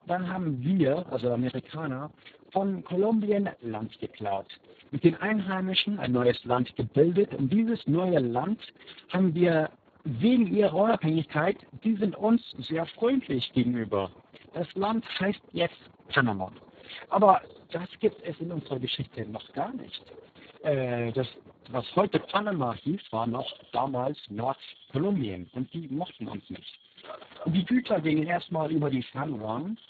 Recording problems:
garbled, watery; badly; nothing above 4 kHz
animal sounds; faint; throughout; 25 dB below the speech

